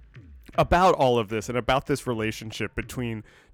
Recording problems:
background music; faint; throughout; 30 dB below the speech

